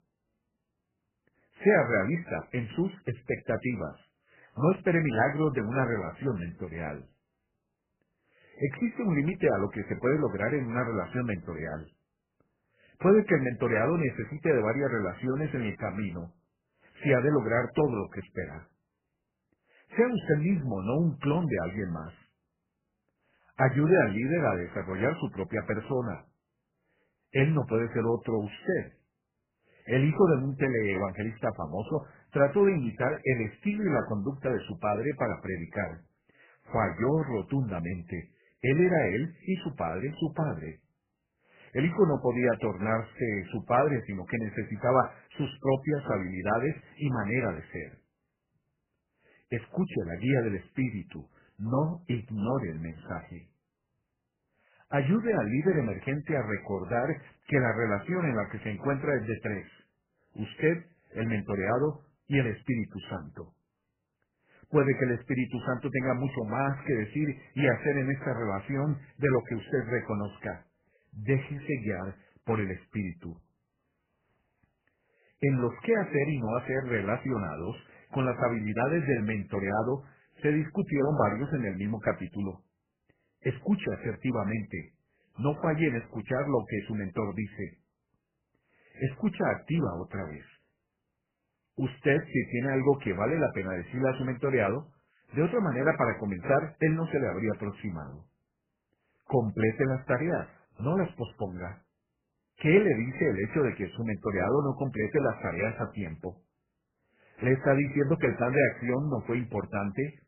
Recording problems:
garbled, watery; badly; nothing above 3 kHz

